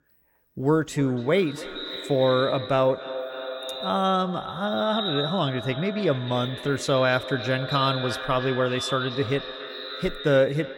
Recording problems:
echo of what is said; strong; throughout; 290 ms later, 8 dB below the speech

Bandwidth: 16.5 kHz